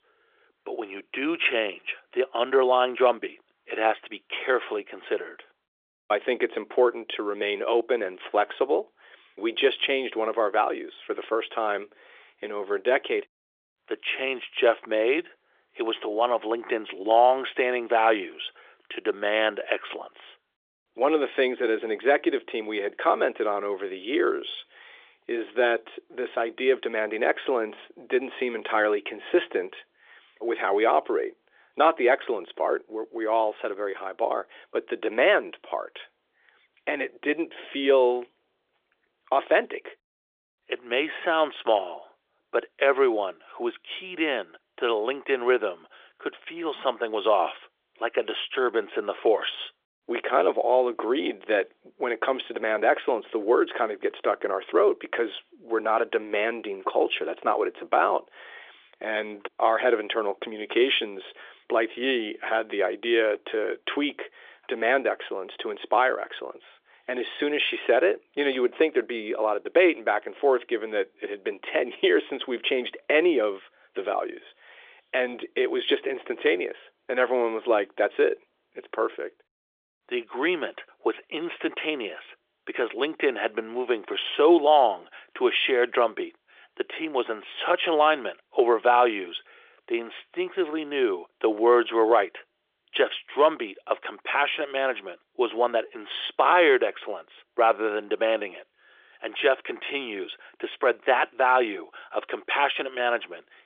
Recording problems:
phone-call audio; nothing above 3.5 kHz

